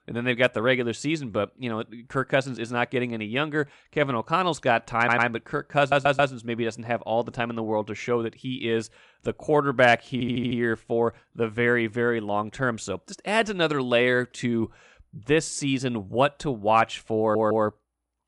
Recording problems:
audio stuttering; 4 times, first at 5 s

